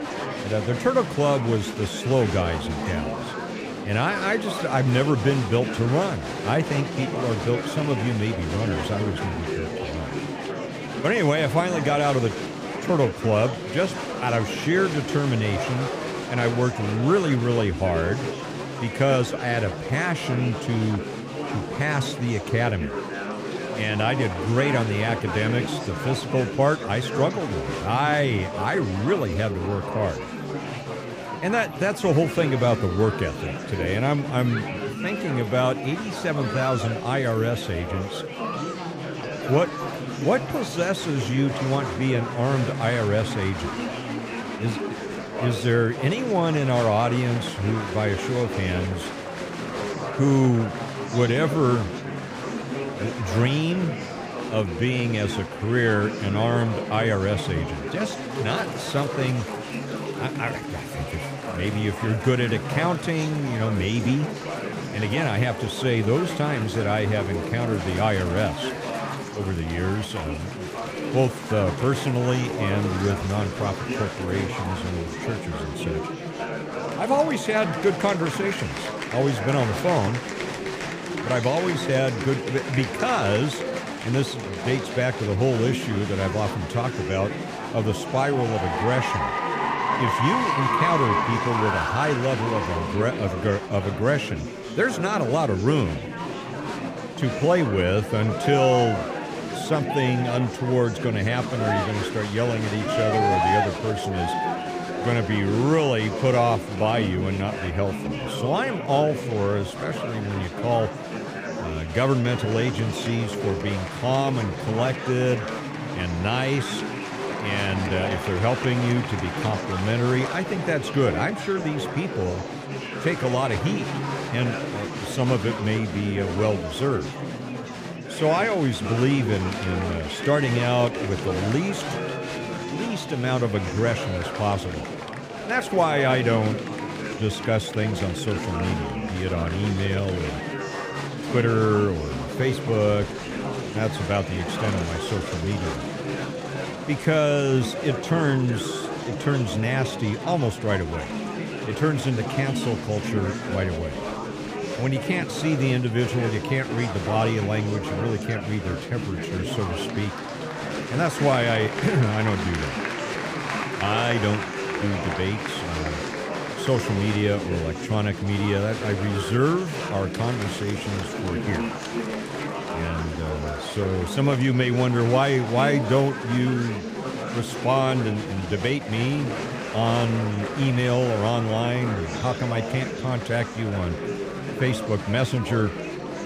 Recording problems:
murmuring crowd; loud; throughout; 5 dB below the speech

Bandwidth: 15 kHz